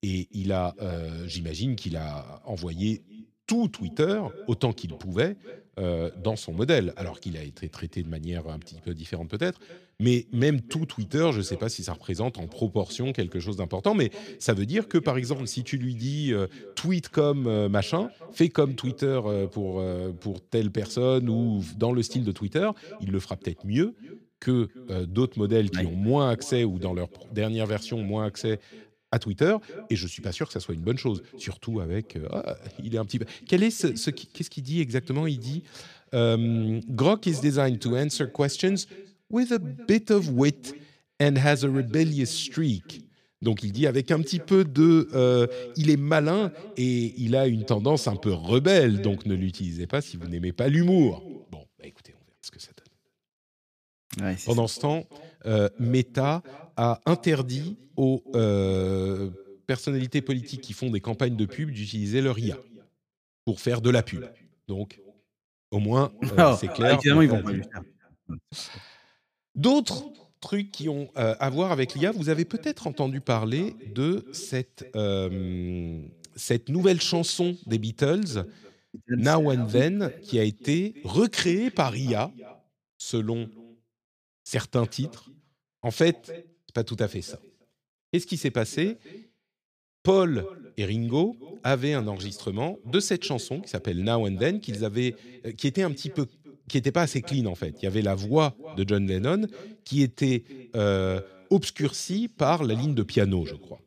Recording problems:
echo of what is said; faint; throughout; 270 ms later, 20 dB below the speech

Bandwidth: 14.5 kHz